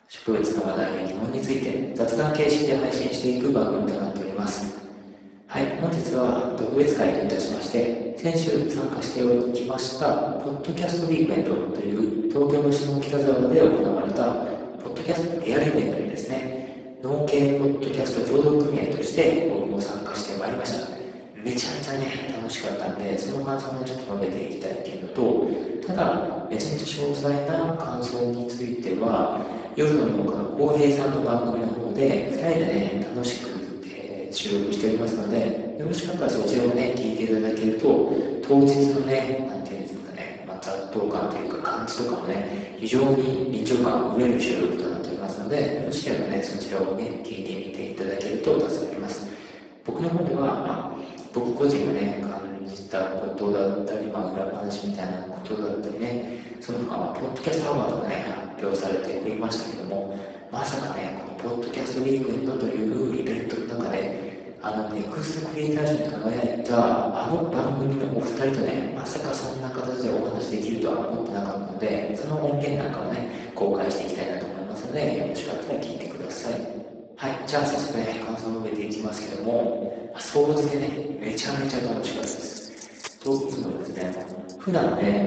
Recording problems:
off-mic speech; far
garbled, watery; badly; nothing above 7.5 kHz
room echo; noticeable; dies away in 1.4 s
thin; somewhat; fading below 300 Hz
jangling keys; faint; from 1:22 to 1:25; peak 10 dB below the speech

